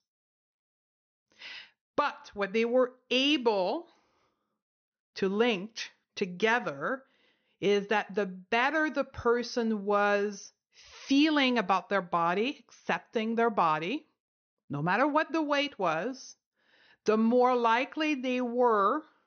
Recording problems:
high frequencies cut off; noticeable; nothing above 6.5 kHz

